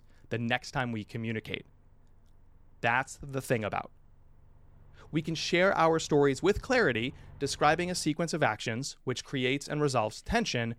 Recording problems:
traffic noise; faint; throughout; 30 dB below the speech

